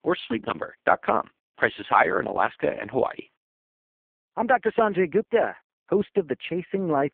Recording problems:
phone-call audio; poor line

